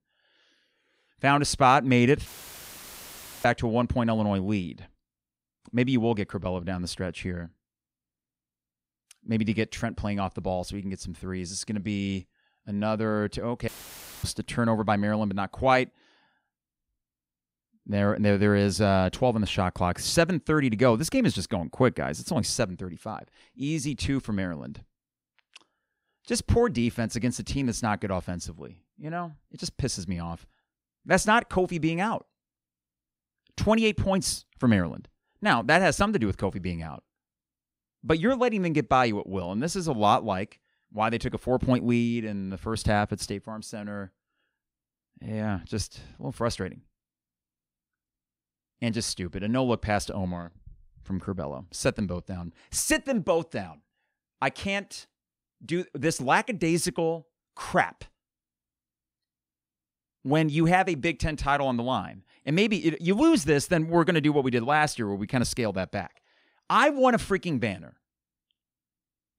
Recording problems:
audio cutting out; filled with static; at 2.5 s for 1 s and at 14 s for 0.5 s

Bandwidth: 15.5 kHz